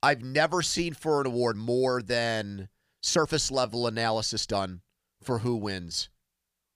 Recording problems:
uneven, jittery; strongly; from 0.5 to 6 s

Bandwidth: 15 kHz